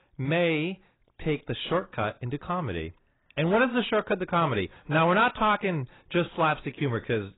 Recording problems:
garbled, watery; badly; nothing above 4 kHz
distortion; slight; 10 dB below the speech

